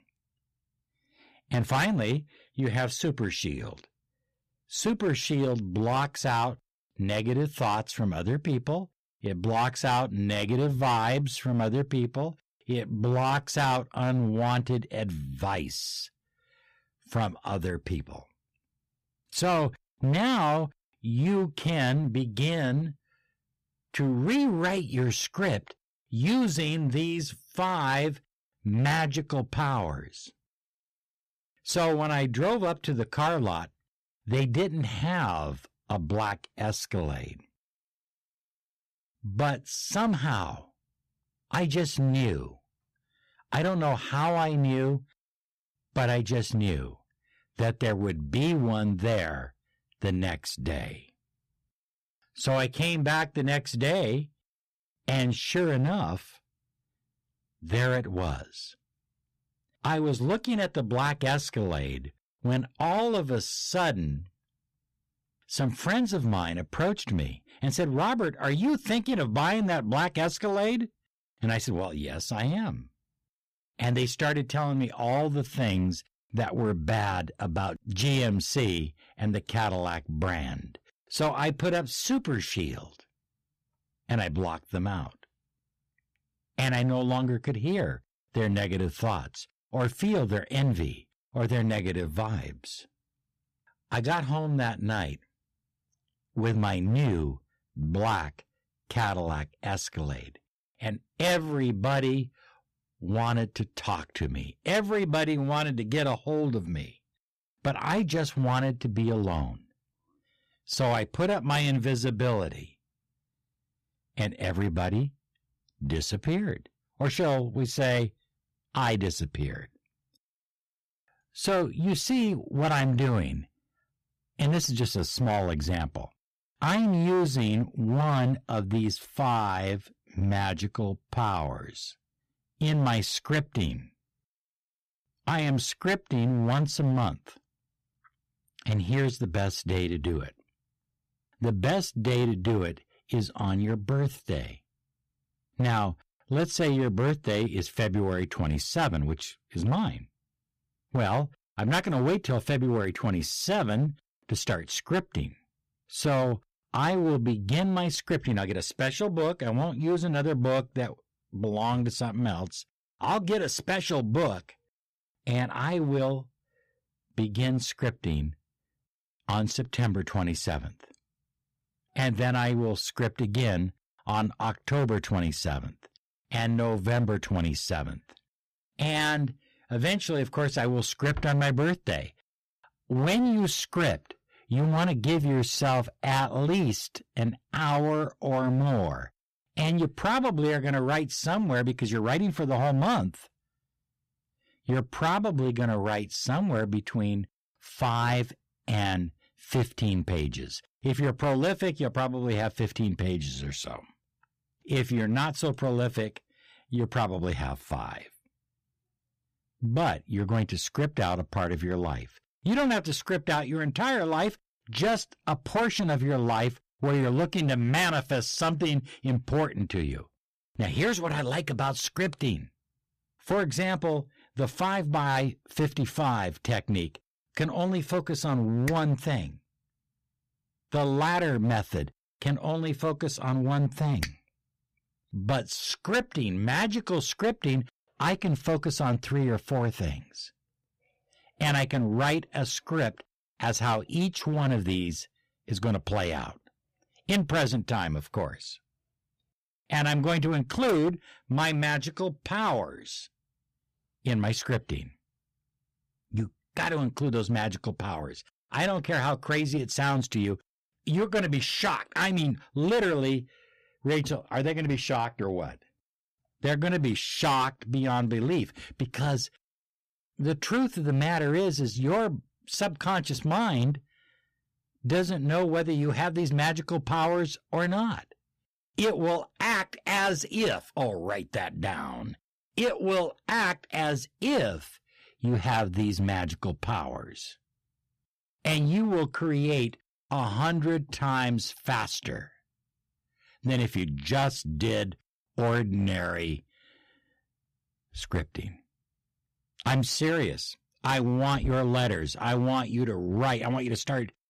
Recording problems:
distortion; slight; 9% of the sound clipped

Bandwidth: 15 kHz